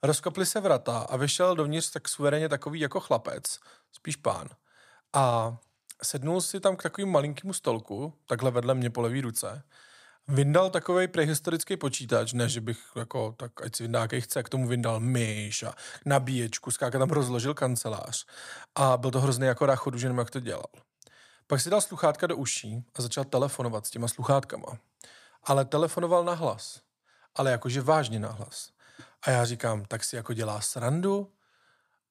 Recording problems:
none

